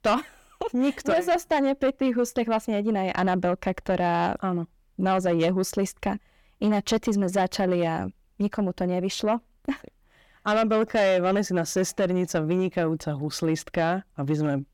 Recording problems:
distortion; slight; 10 dB below the speech

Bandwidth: 18 kHz